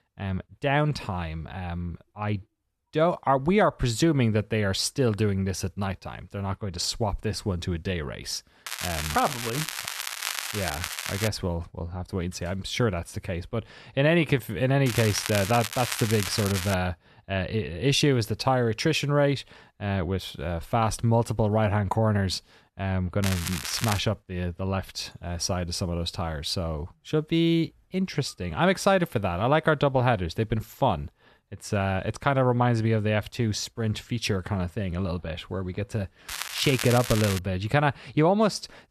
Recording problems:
crackling; loud; 4 times, first at 8.5 s; 5 dB below the speech

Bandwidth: 13.5 kHz